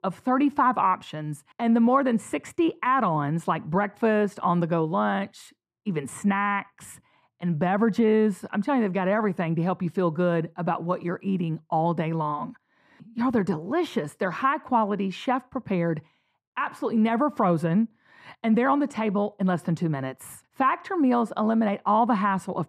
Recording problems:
muffled; very; fading above 2 kHz

